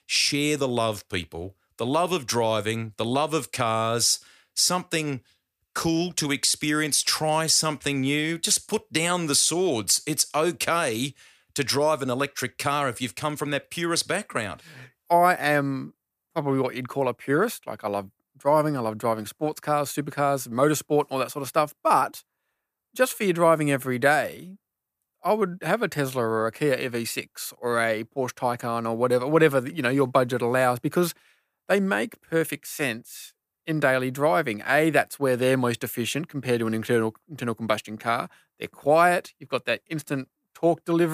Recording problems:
abrupt cut into speech; at the end

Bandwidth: 15 kHz